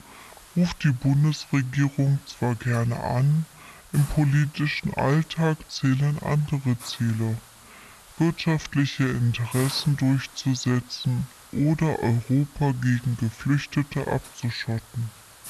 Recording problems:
wrong speed and pitch; too slow and too low; 0.6 times normal speed
high frequencies cut off; noticeable; nothing above 8 kHz
hiss; noticeable; throughout; 20 dB below the speech

